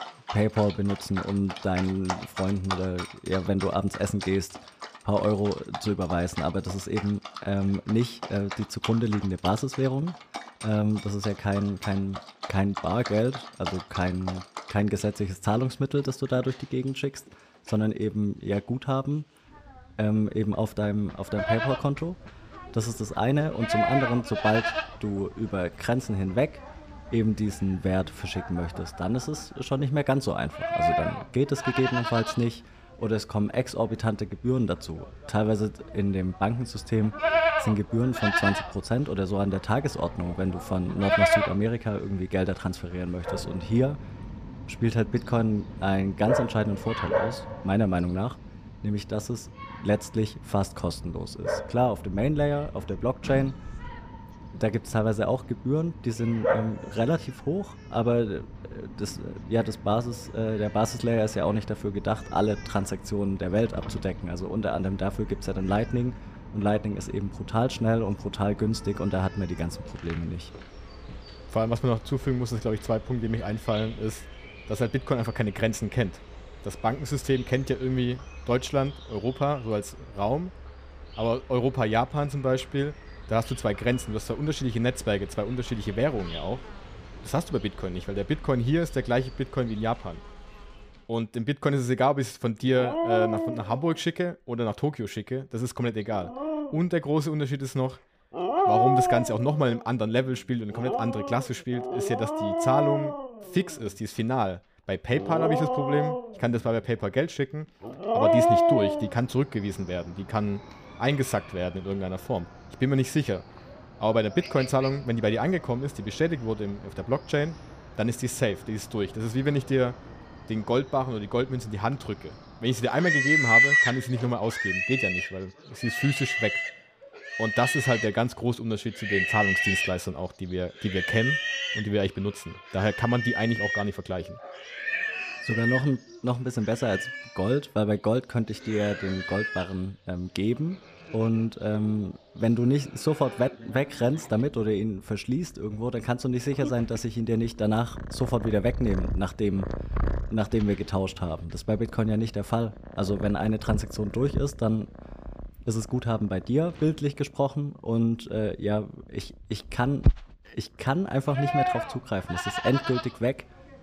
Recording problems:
animal sounds; loud; throughout; 2 dB below the speech

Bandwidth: 15 kHz